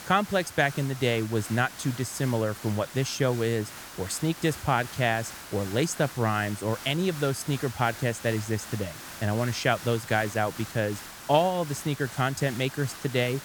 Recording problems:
hiss; noticeable; throughout; 15 dB below the speech

